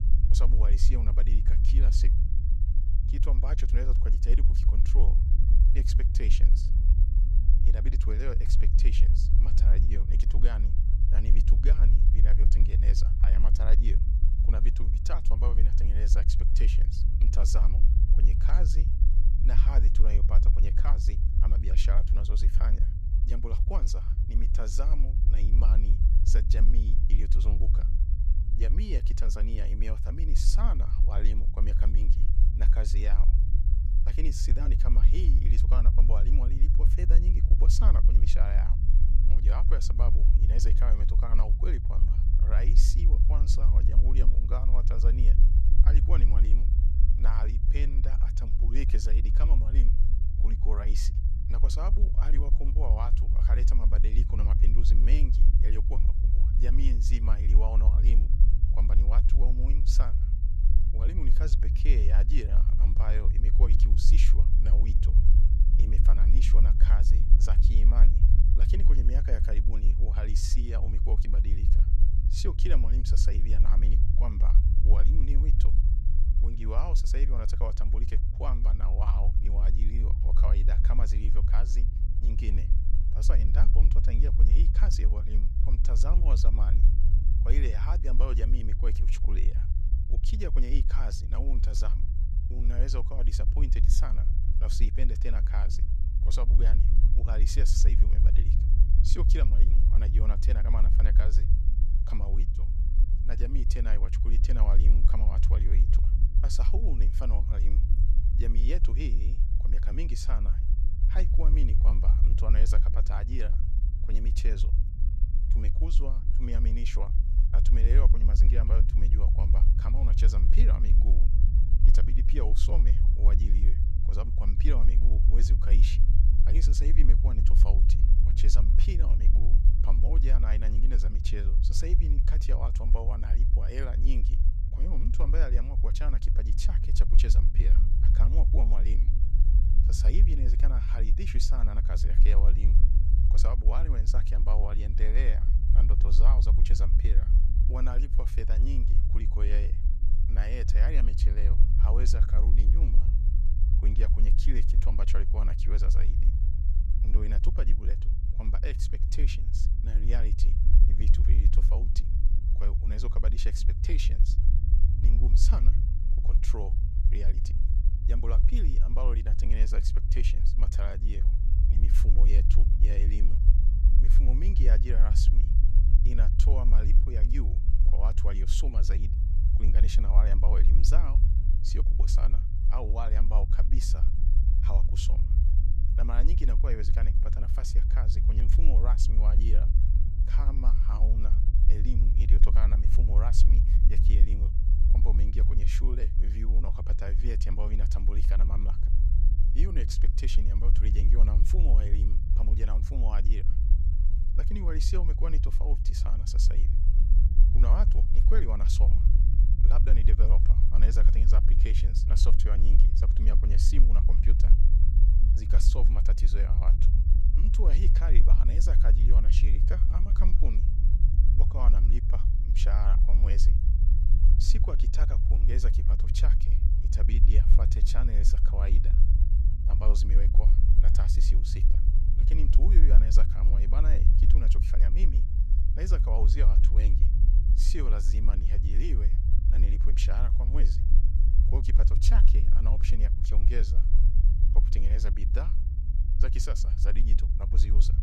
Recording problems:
low rumble; loud; throughout; 4 dB below the speech

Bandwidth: 14.5 kHz